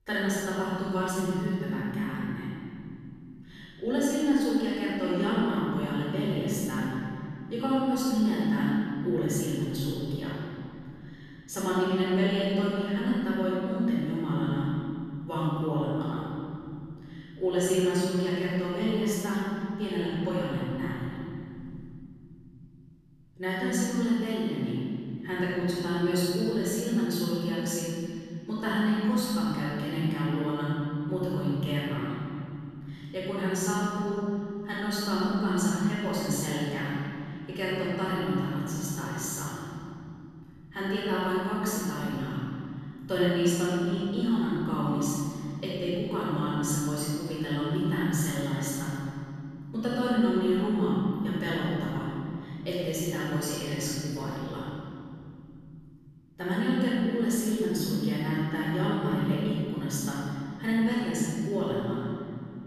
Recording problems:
room echo; strong; dies away in 3 s
off-mic speech; far

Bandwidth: 14.5 kHz